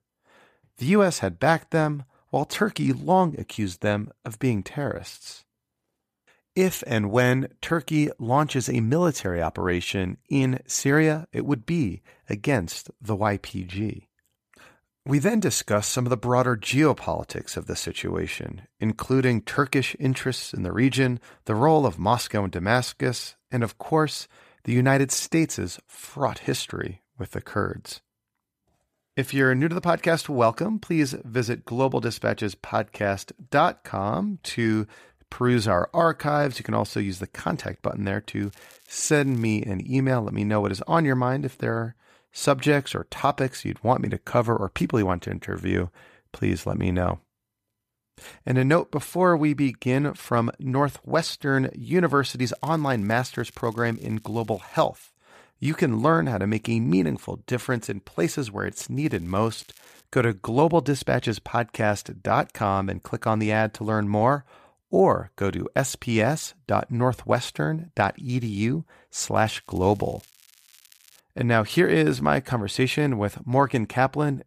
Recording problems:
crackling; faint; 4 times, first at 38 s; 30 dB below the speech

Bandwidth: 14.5 kHz